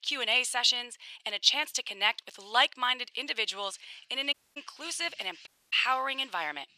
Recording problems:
thin; very; fading below 850 Hz
household noises; faint; throughout; 25 dB below the speech
audio cutting out; at 4.5 s and at 5.5 s

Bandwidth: 14 kHz